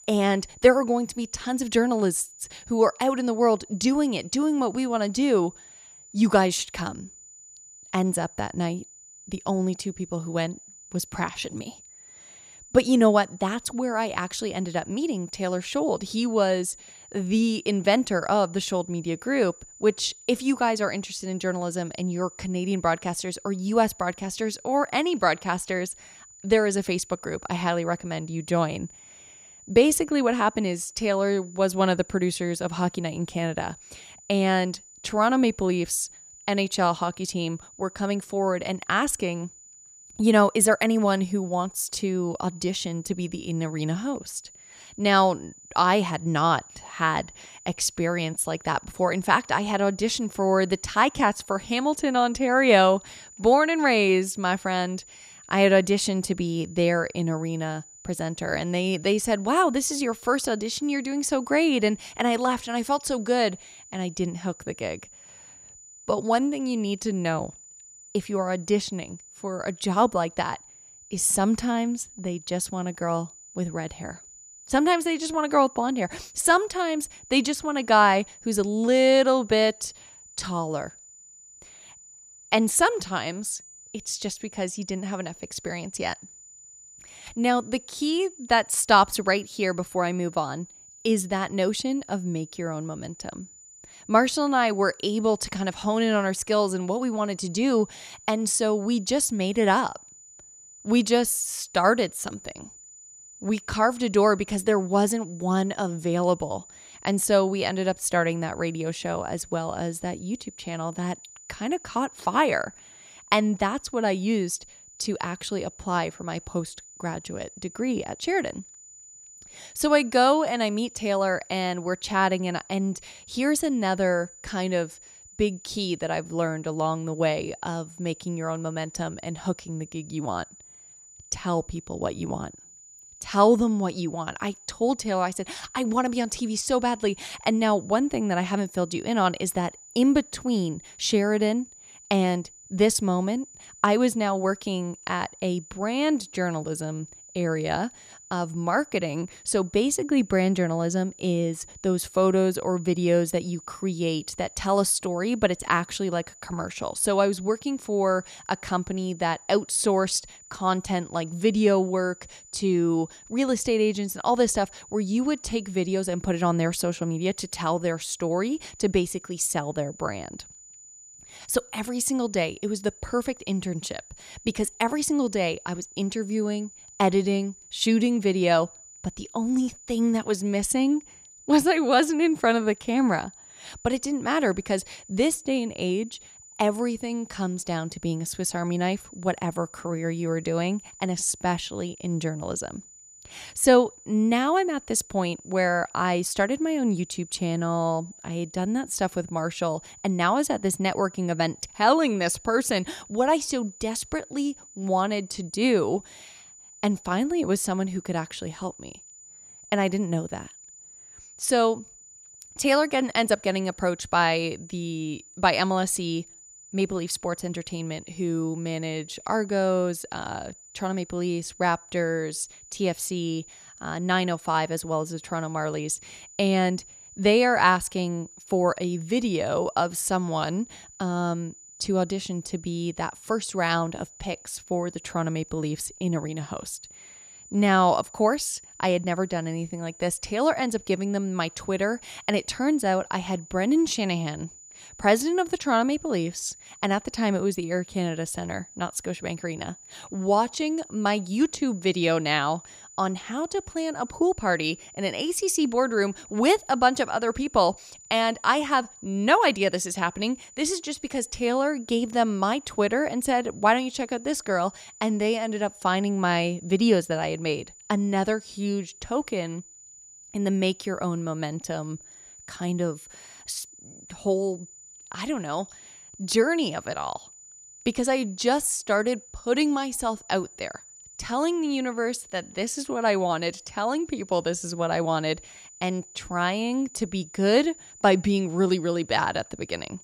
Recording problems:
high-pitched whine; faint; throughout; 7 kHz, 20 dB below the speech

